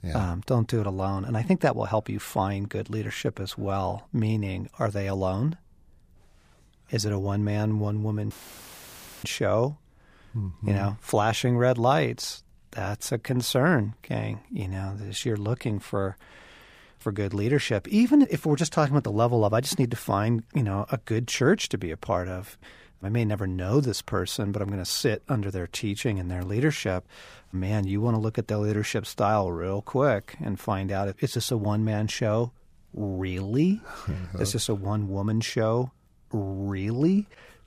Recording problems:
audio cutting out; filled with static; at 8.5 s for 1 s

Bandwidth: 15 kHz